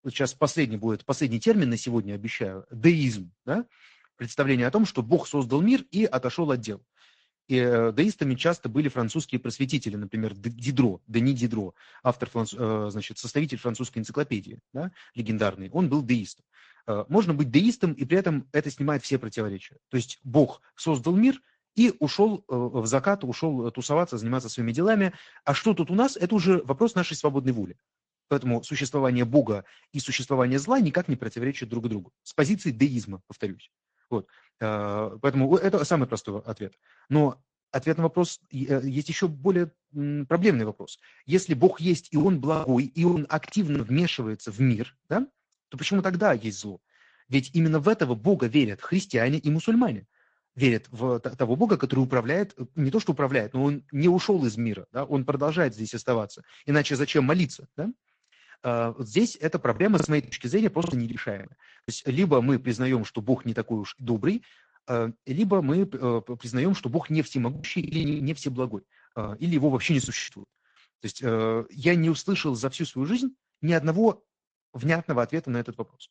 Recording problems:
garbled, watery; slightly
choppy; very; from 42 to 44 s, from 1:00 to 1:02 and from 1:08 to 1:10; 15% of the speech affected

